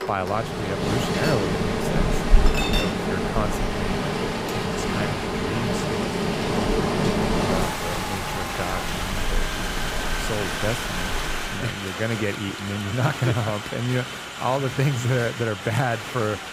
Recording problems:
rain or running water; very loud; until 12 s; 3 dB above the speech
crowd noise; loud; throughout; 4 dB below the speech
household noises; loud; until 13 s; 7 dB below the speech
murmuring crowd; noticeable; throughout; 20 dB below the speech

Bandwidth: 15.5 kHz